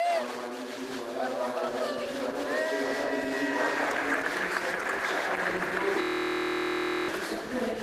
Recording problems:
room echo; strong; dies away in 1.6 s
off-mic speech; far
garbled, watery; slightly; nothing above 14.5 kHz
thin; very slightly; fading below 250 Hz
crowd noise; very loud; throughout; 1 dB above the speech
audio freezing; at 6 s for 1 s

